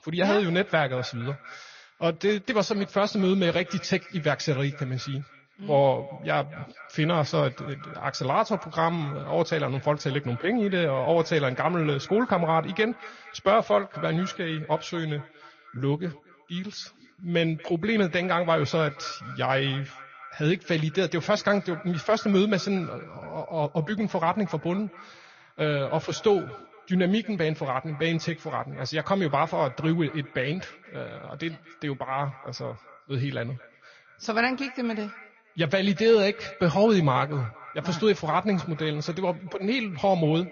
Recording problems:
echo of what is said; faint; throughout; 230 ms later, 20 dB below the speech
garbled, watery; slightly; nothing above 6.5 kHz

